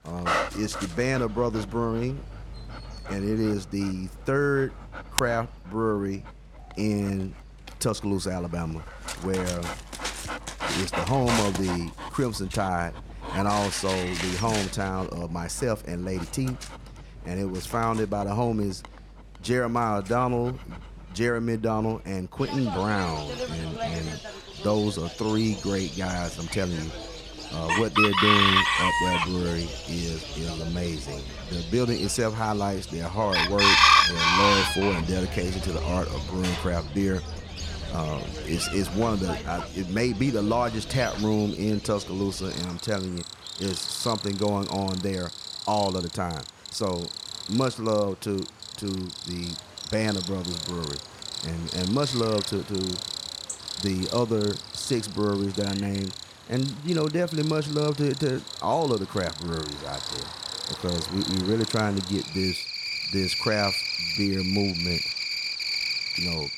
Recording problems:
animal sounds; loud; throughout; 1 dB below the speech

